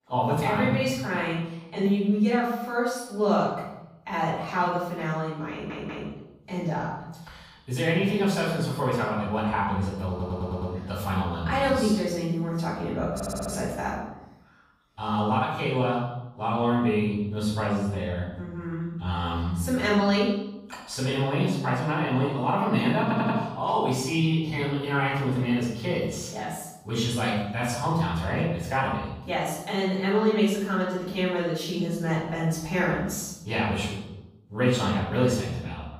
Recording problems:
off-mic speech; far
room echo; noticeable; dies away in 0.9 s
audio stuttering; 4 times, first at 5.5 s

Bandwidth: 15 kHz